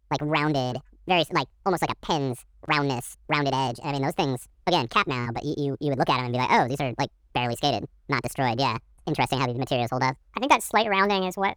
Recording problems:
wrong speed and pitch; too fast and too high; 1.6 times normal speed

